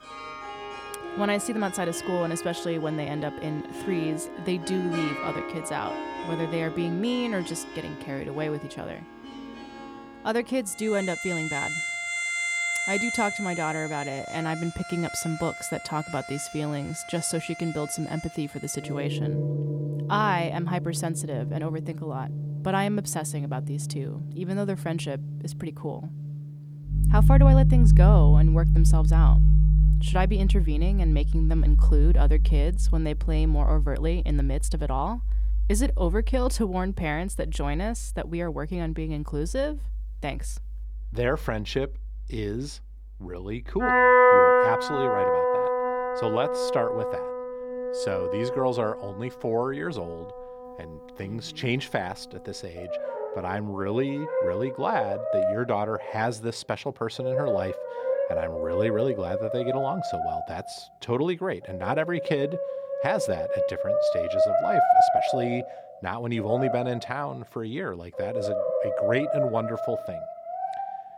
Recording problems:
background music; very loud; throughout; 4 dB above the speech

